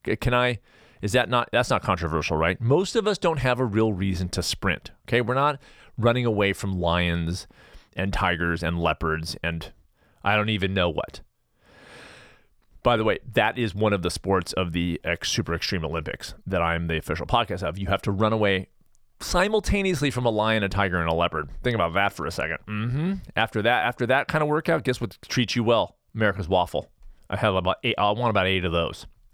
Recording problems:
none

